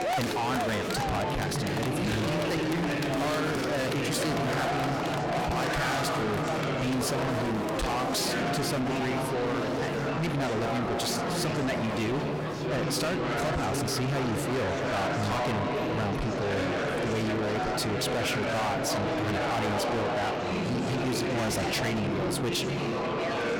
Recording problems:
distortion; heavy; 6 dB below the speech
murmuring crowd; very loud; throughout; 1 dB above the speech

